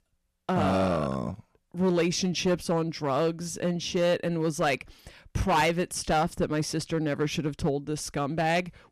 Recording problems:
distortion; slight; 6% of the sound clipped

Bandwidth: 14.5 kHz